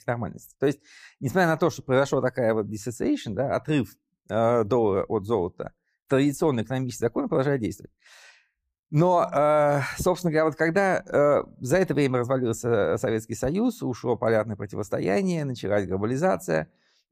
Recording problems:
none

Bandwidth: 14.5 kHz